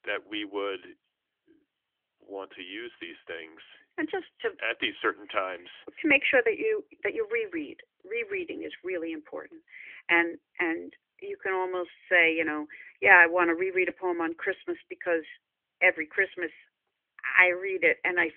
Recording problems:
thin; somewhat; fading below 250 Hz
phone-call audio

